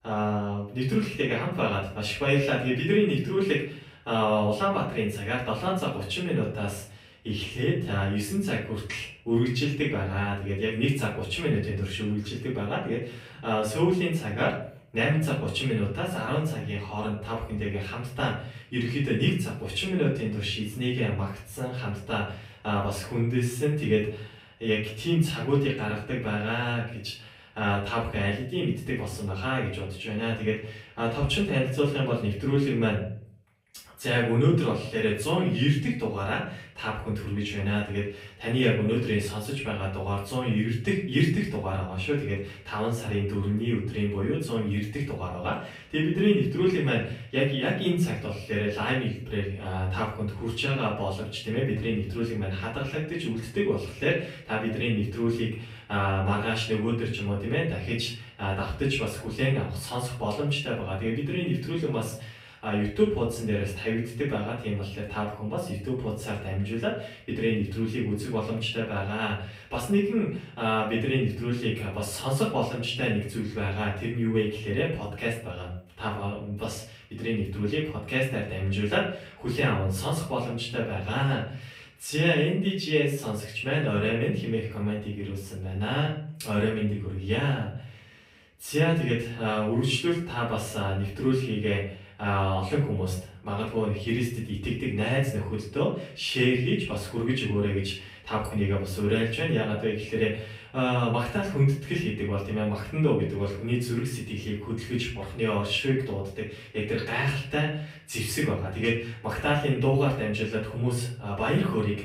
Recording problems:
off-mic speech; far
room echo; noticeable; dies away in 0.4 s

